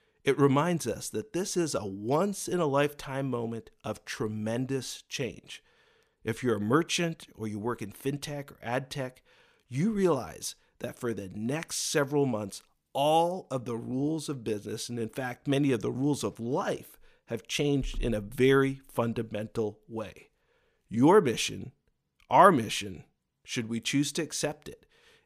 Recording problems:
none

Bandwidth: 15 kHz